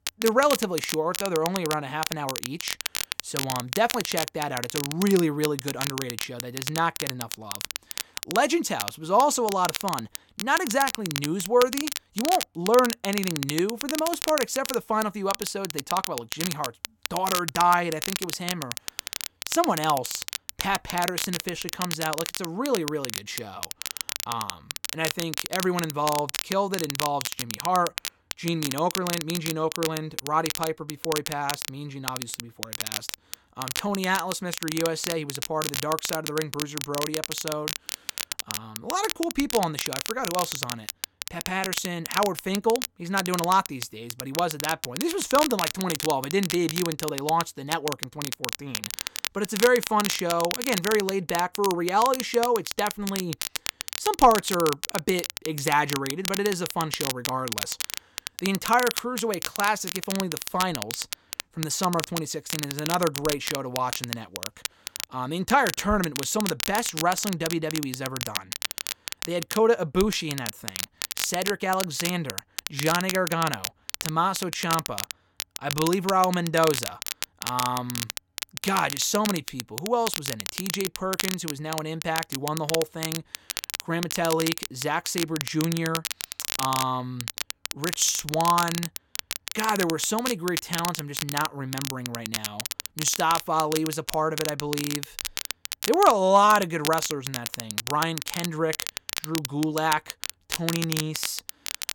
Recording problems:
crackle, like an old record; loud; 5 dB below the speech

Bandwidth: 17 kHz